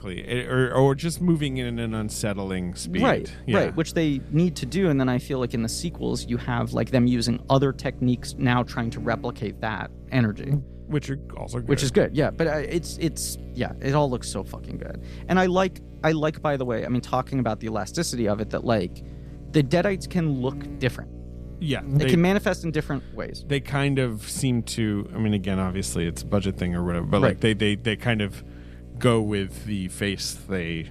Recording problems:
electrical hum; faint; throughout; 60 Hz, 20 dB below the speech

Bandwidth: 14.5 kHz